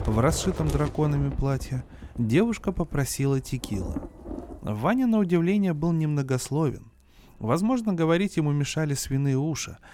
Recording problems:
rain or running water; noticeable; throughout; 10 dB below the speech

